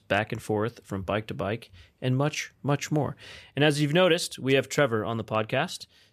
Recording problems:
none

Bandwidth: 14.5 kHz